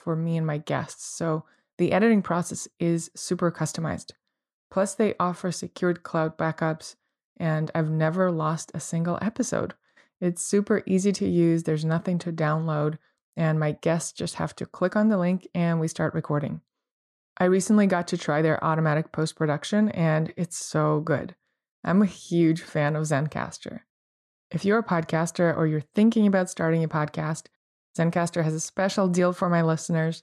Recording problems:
none

